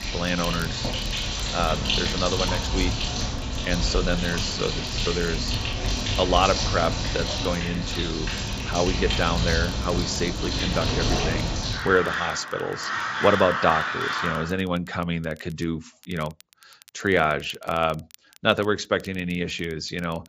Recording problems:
high frequencies cut off; noticeable; nothing above 8 kHz
animal sounds; loud; until 14 s; as loud as the speech
crackle, like an old record; faint; 25 dB below the speech

